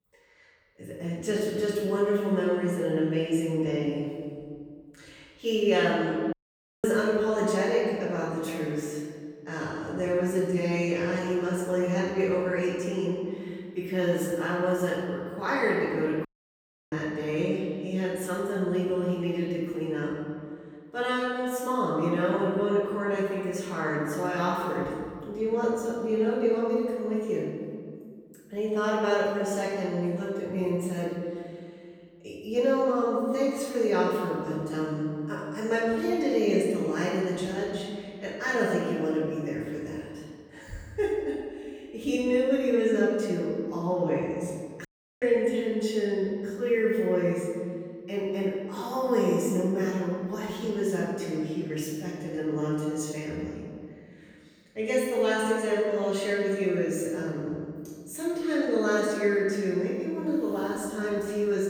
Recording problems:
off-mic speech; far
room echo; noticeable; dies away in 1.8 s
audio cutting out; at 6.5 s for 0.5 s, at 16 s for 0.5 s and at 45 s

